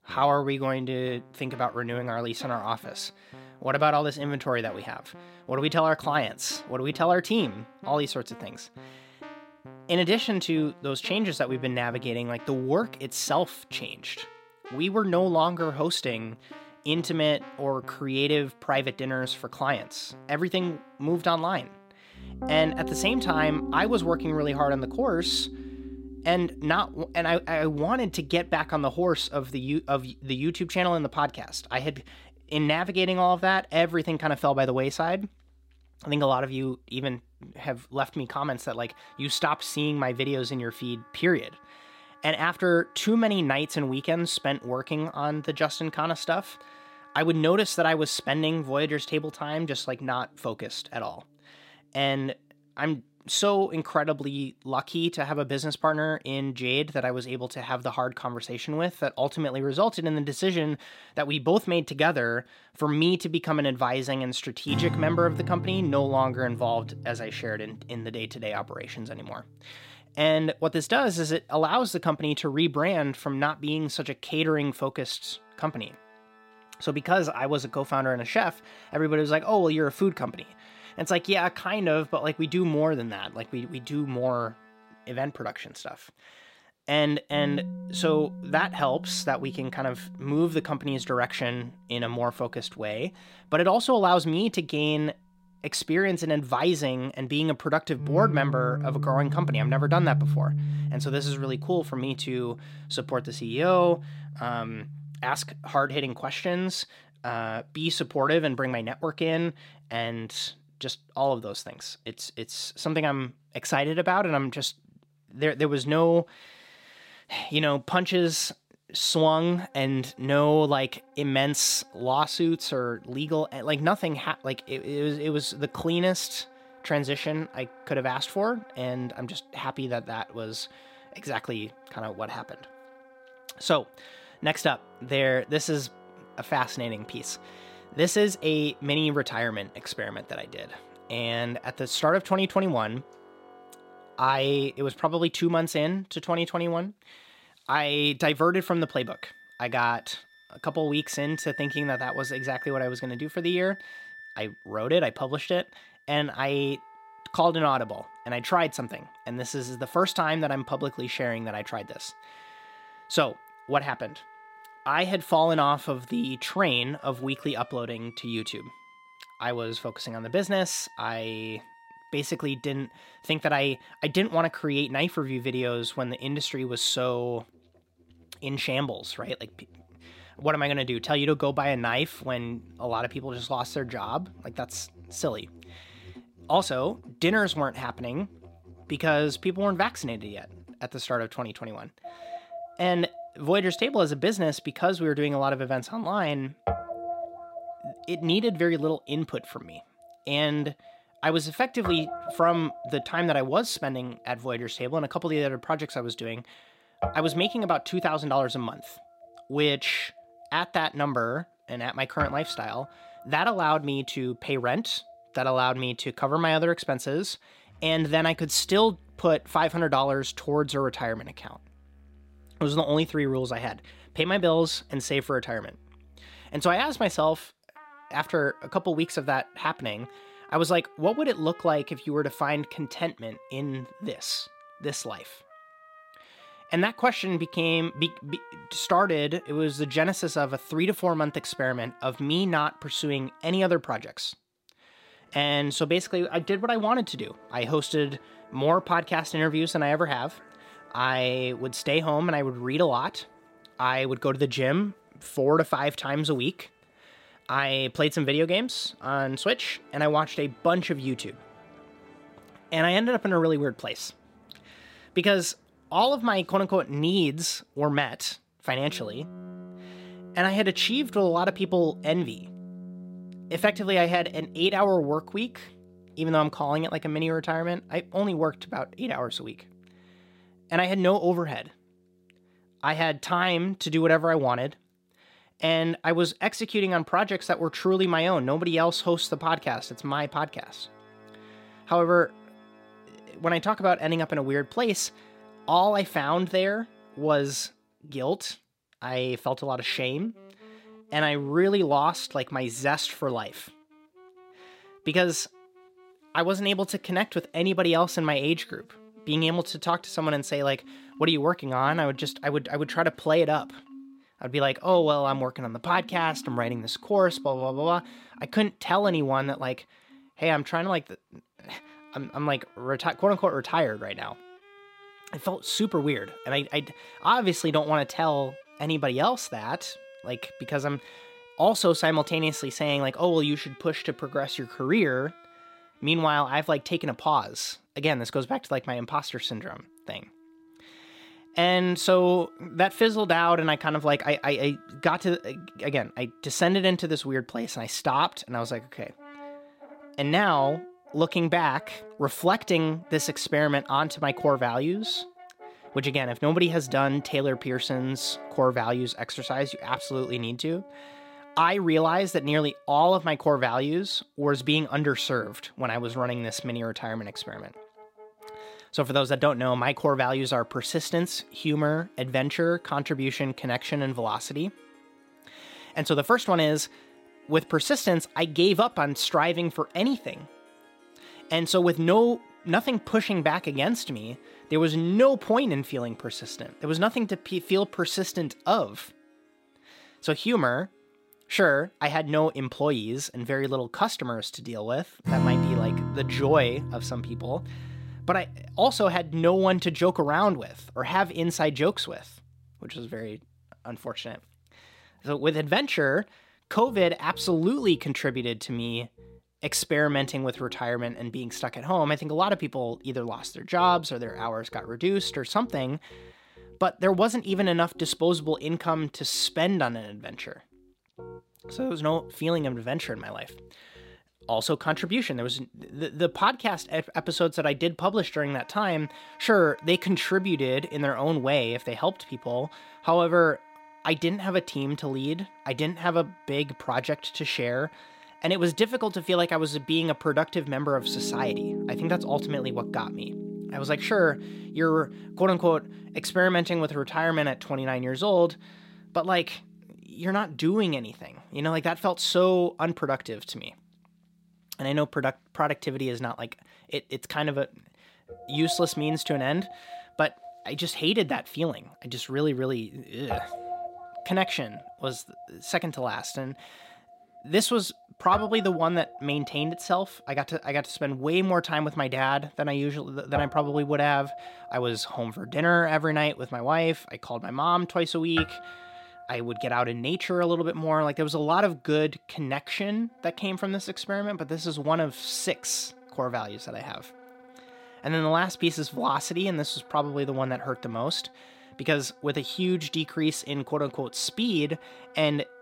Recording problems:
background music; noticeable; throughout; 15 dB below the speech

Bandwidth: 16 kHz